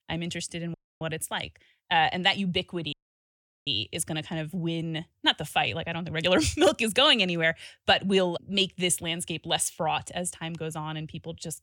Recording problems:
audio cutting out; at 0.5 s and at 3 s for 0.5 s

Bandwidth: 18 kHz